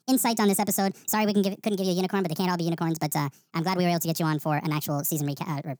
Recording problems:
wrong speed and pitch; too fast and too high; 1.6 times normal speed

